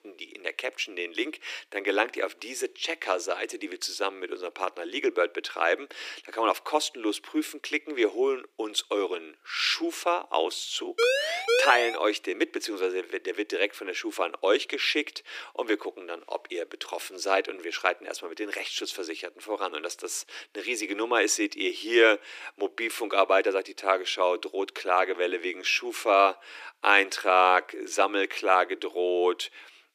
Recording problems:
thin; very; fading below 300 Hz
siren; loud; at 11 s; peak 3 dB above the speech

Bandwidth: 15 kHz